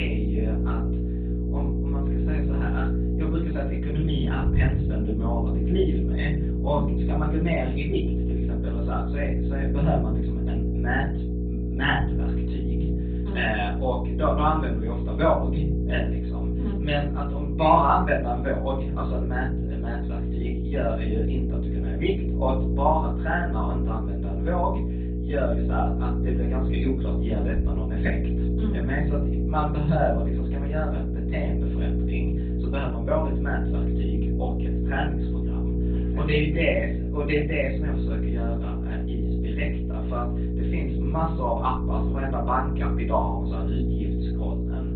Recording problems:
off-mic speech; far
garbled, watery; badly
high frequencies cut off; severe; nothing above 4 kHz
room echo; slight; dies away in 0.4 s
electrical hum; loud; throughout; 60 Hz, 8 dB below the speech
abrupt cut into speech; at the start

